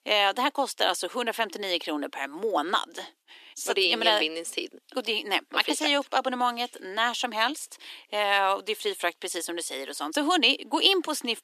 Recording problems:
thin; somewhat; fading below 300 Hz

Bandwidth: 14 kHz